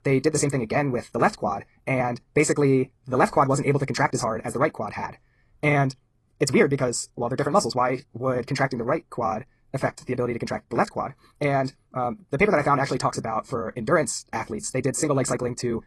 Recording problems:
wrong speed, natural pitch; too fast; 1.7 times normal speed
garbled, watery; slightly

